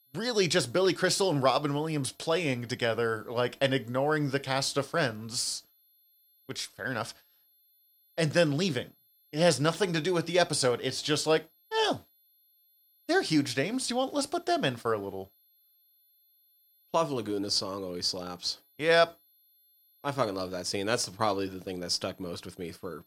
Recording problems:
high-pitched whine; faint; throughout; 11.5 kHz, 35 dB below the speech

